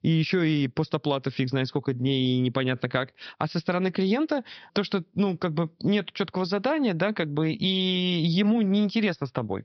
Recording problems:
high frequencies cut off; noticeable; nothing above 5.5 kHz

